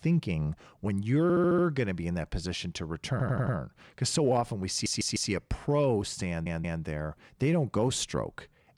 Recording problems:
audio stuttering; 4 times, first at 1 s

